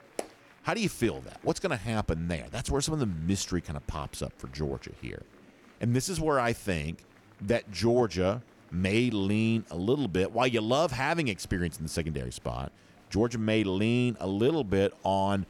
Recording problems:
murmuring crowd; faint; throughout; 30 dB below the speech

